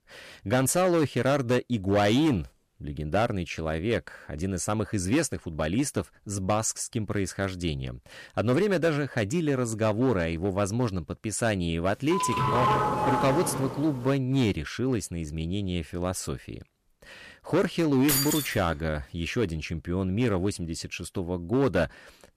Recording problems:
distortion; slight; 5% of the sound clipped
doorbell; loud; from 12 to 14 s; peak 4 dB above the speech
jangling keys; loud; at 18 s; peak 3 dB above the speech

